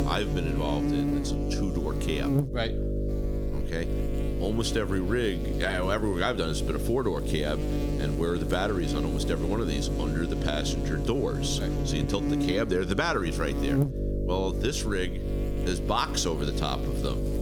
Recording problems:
squashed, flat; somewhat
electrical hum; loud; throughout; 50 Hz, 5 dB below the speech

